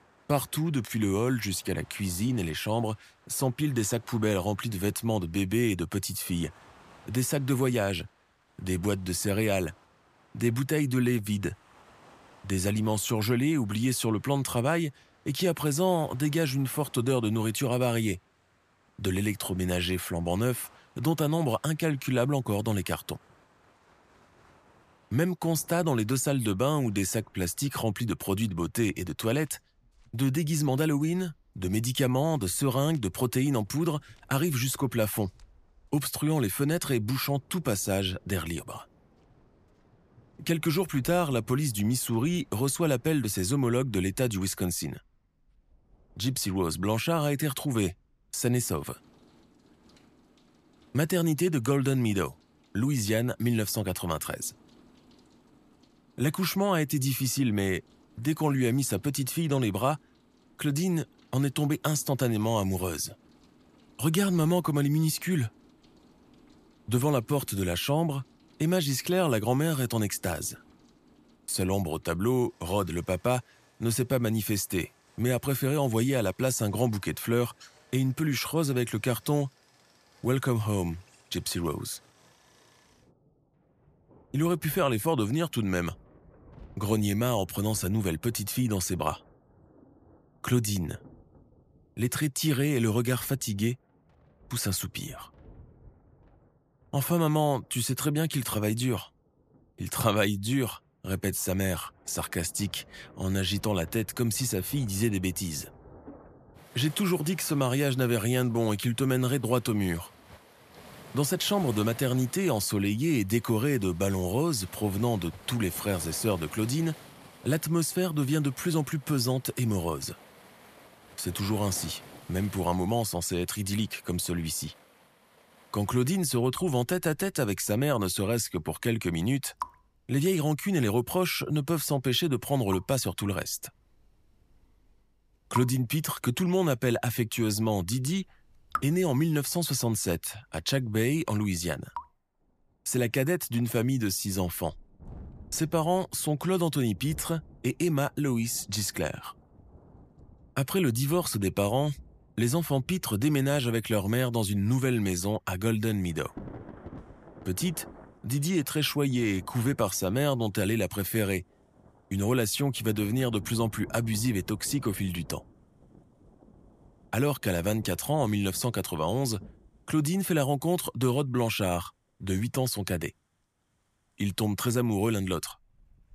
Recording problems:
rain or running water; faint; throughout; 25 dB below the speech

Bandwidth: 14.5 kHz